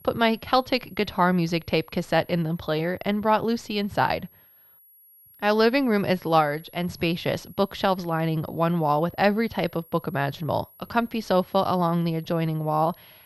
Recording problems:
muffled; very slightly; fading above 3.5 kHz
high-pitched whine; faint; throughout; 11.5 kHz, 25 dB below the speech

